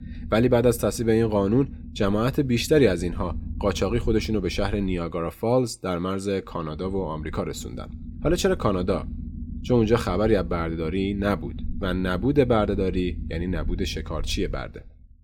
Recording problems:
low rumble; faint; throughout; 20 dB below the speech

